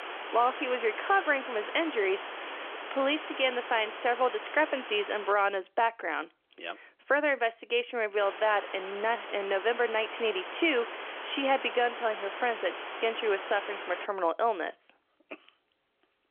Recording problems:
phone-call audio; nothing above 3.5 kHz
muffled; very slightly; fading above 3 kHz
hiss; loud; until 5.5 s and from 8 to 14 s; 9 dB below the speech

